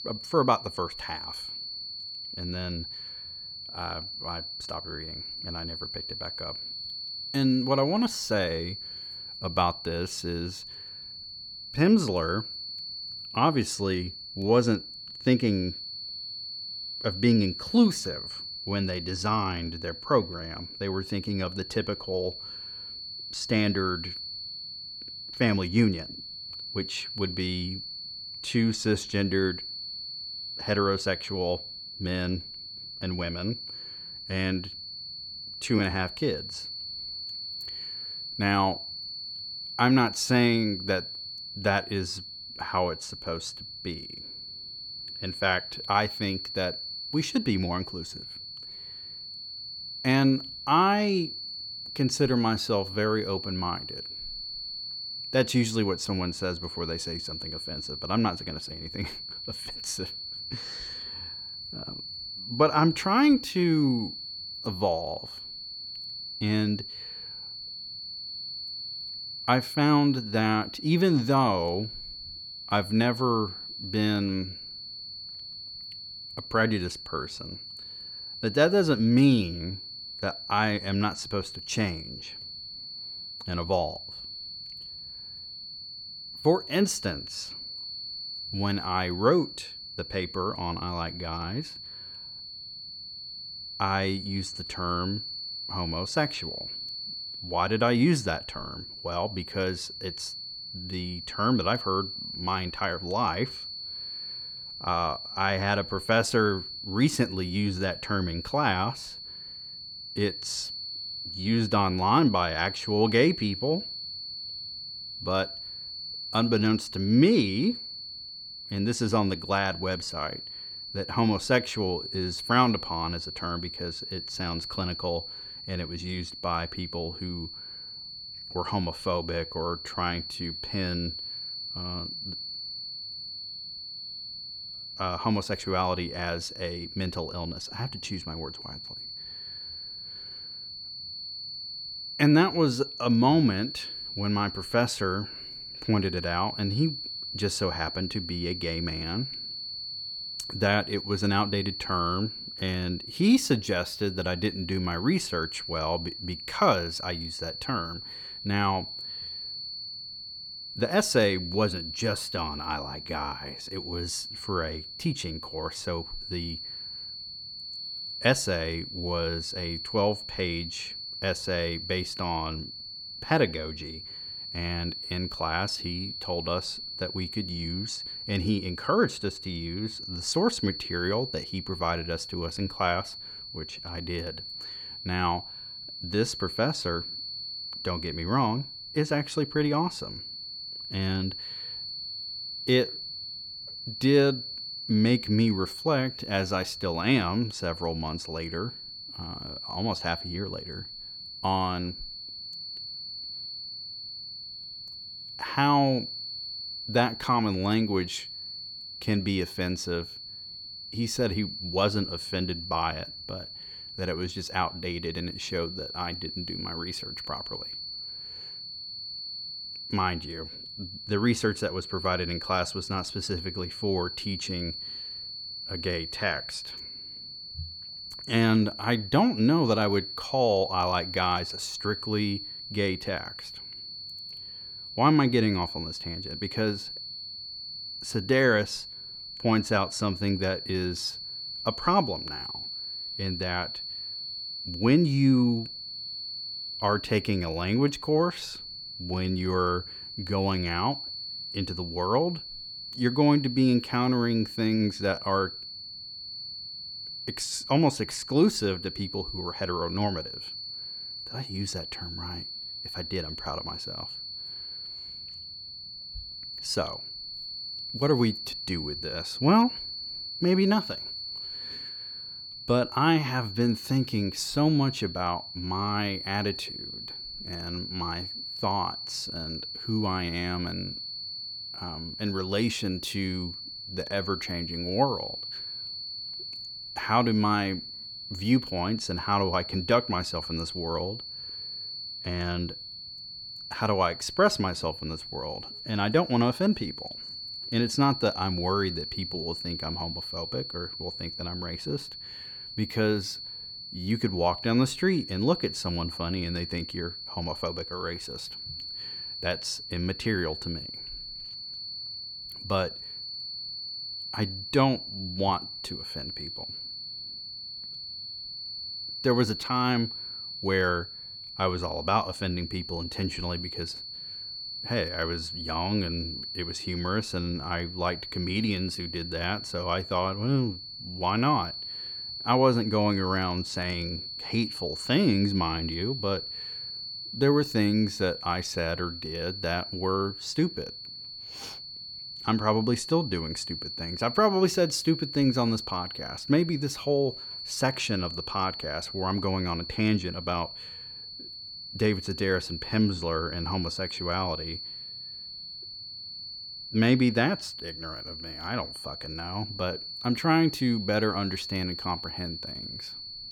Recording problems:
high-pitched whine; loud; throughout; 4.5 kHz, 8 dB below the speech

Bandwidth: 18 kHz